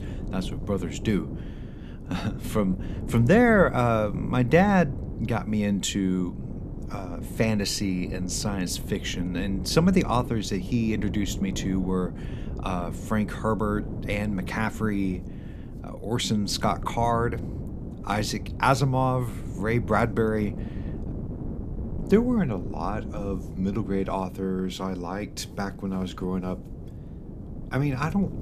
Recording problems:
wind noise on the microphone; occasional gusts; 15 dB below the speech

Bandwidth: 14.5 kHz